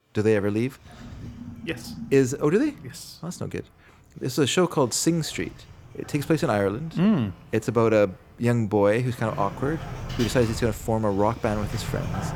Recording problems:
household noises; noticeable; throughout; 15 dB below the speech

